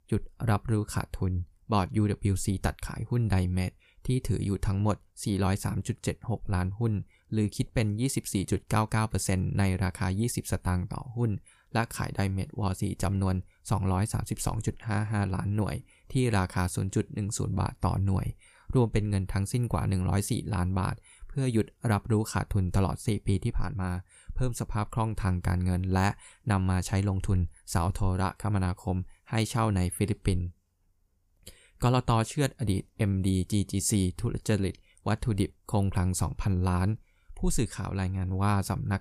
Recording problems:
none

